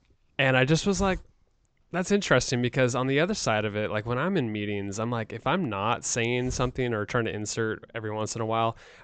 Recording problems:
high frequencies cut off; noticeable; nothing above 8 kHz
hiss; noticeable; throughout; 20 dB below the speech

